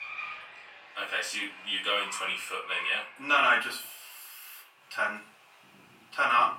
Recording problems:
off-mic speech; far
thin; very; fading below 750 Hz
room echo; slight; dies away in 0.3 s
traffic noise; noticeable; throughout; 15 dB below the speech

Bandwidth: 16.5 kHz